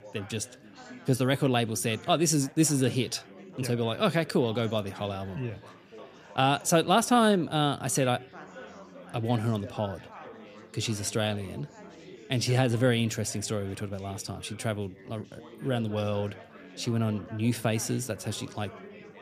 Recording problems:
chatter from many people; noticeable; throughout; 20 dB below the speech

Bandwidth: 14.5 kHz